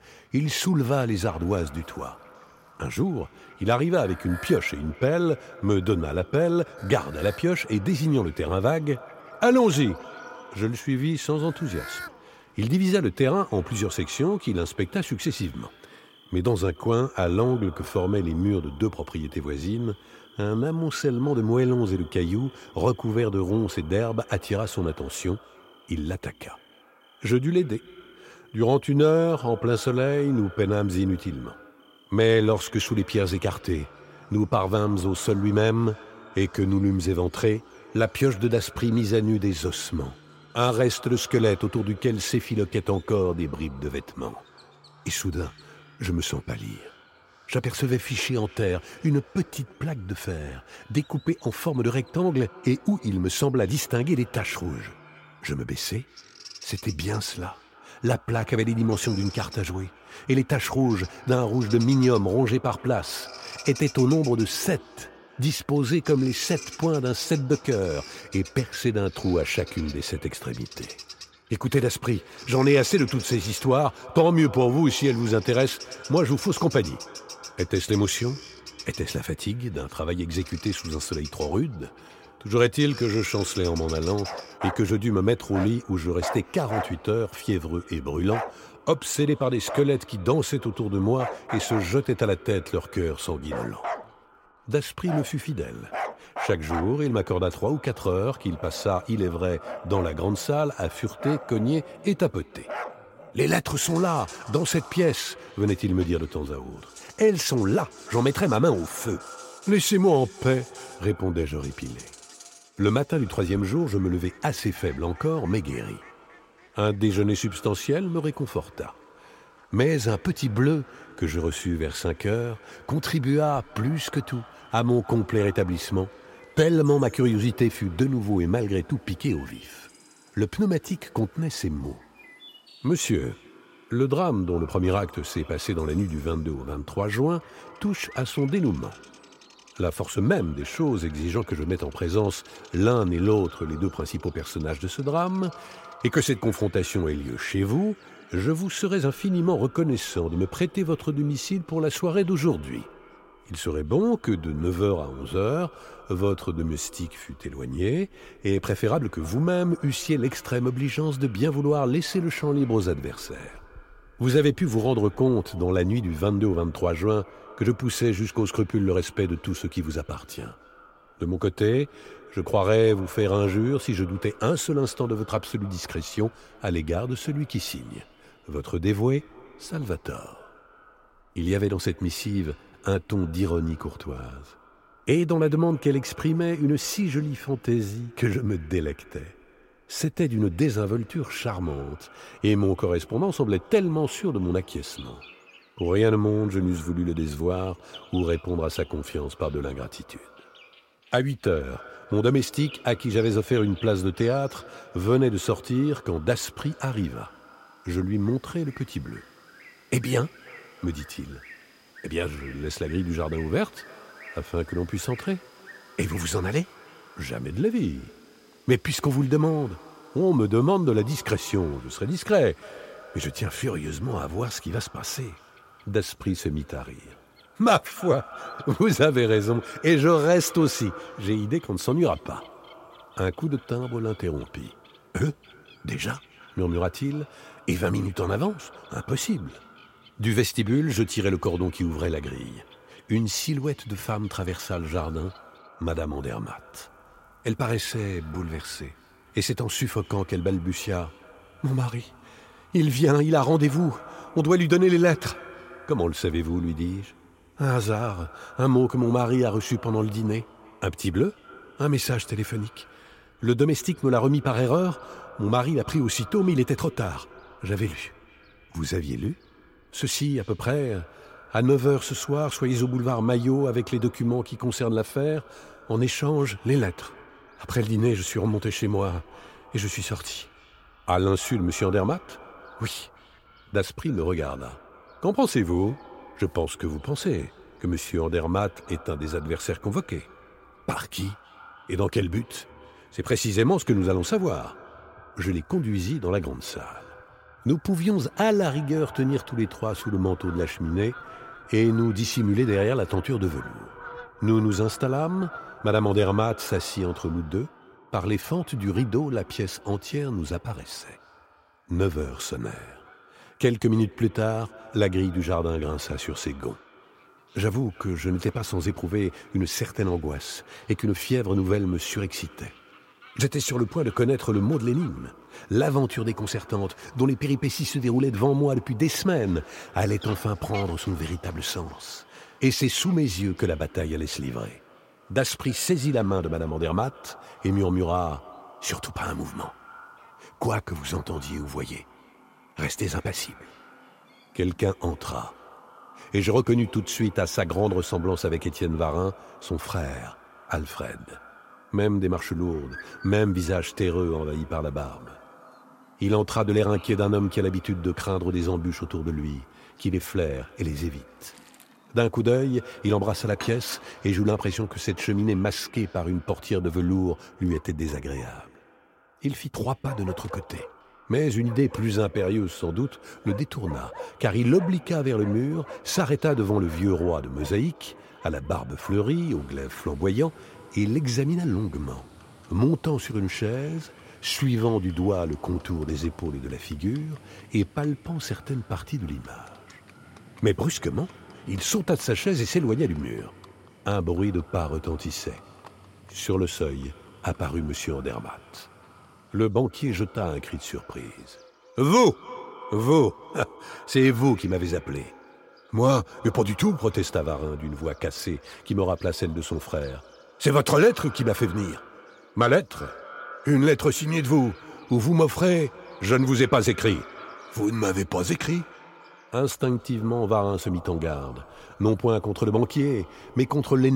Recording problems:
echo of what is said; faint; throughout; 300 ms later, 20 dB below the speech
animal sounds; noticeable; throughout; 20 dB below the speech
abrupt cut into speech; at the end

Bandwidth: 16 kHz